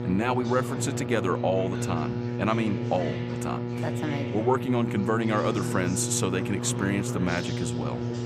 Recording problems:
electrical hum; loud; throughout; 60 Hz, 7 dB below the speech
background chatter; loud; throughout; 4 voices, 9 dB below the speech

